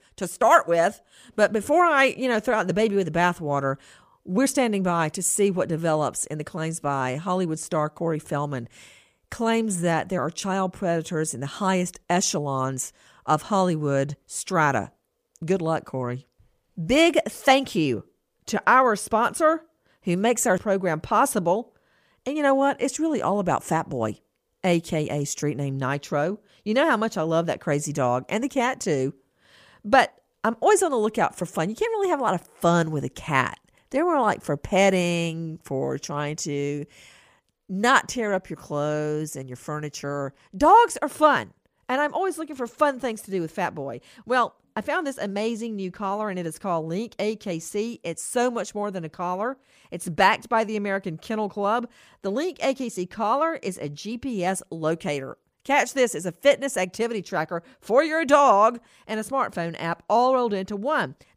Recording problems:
none

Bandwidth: 15 kHz